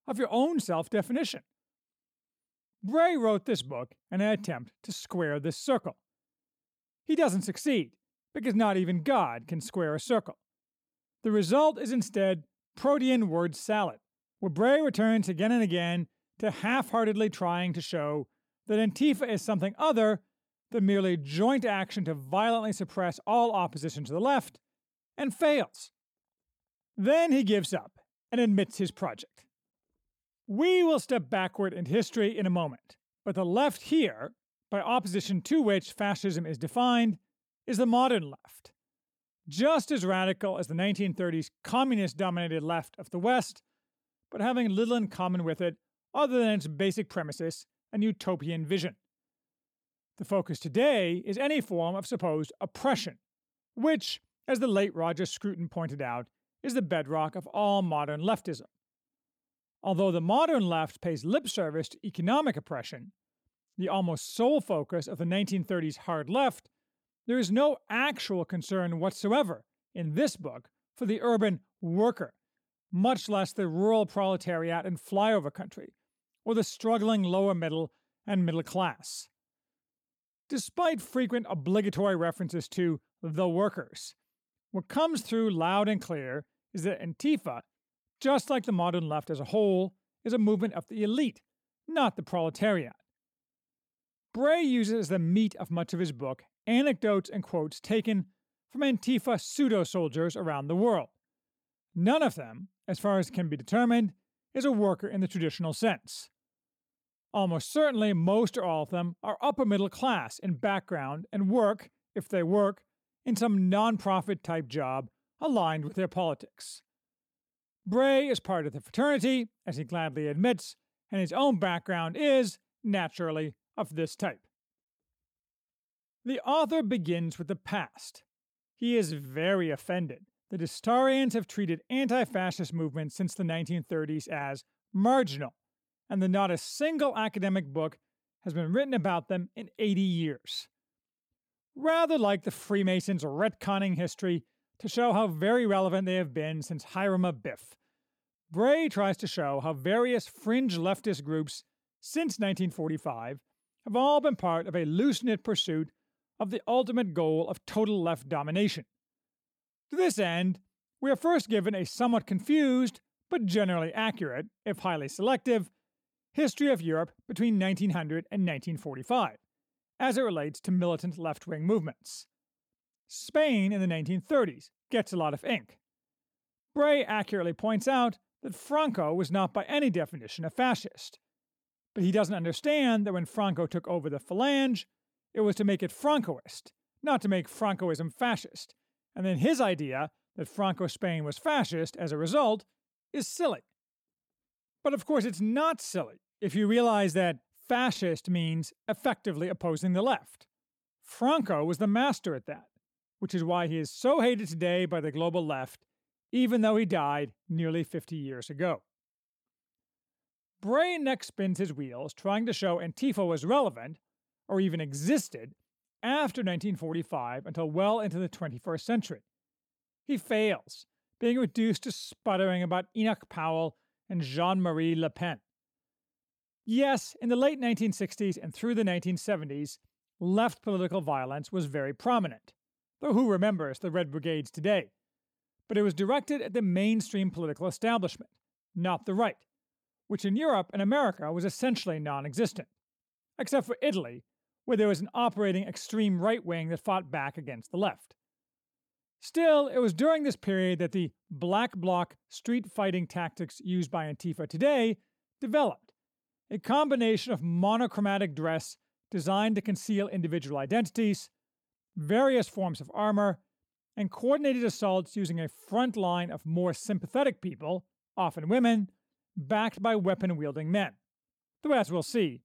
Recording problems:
none

